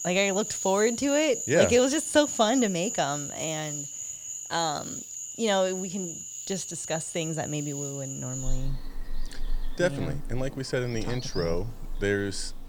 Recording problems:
animal sounds; loud; throughout; 7 dB below the speech

